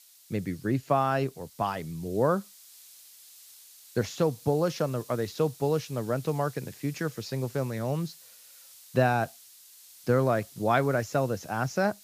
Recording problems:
high frequencies cut off; noticeable; nothing above 7.5 kHz
hiss; faint; throughout; 20 dB below the speech

